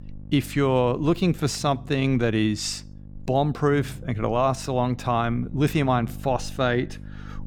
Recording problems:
electrical hum; faint; throughout; 50 Hz, 25 dB below the speech

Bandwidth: 18 kHz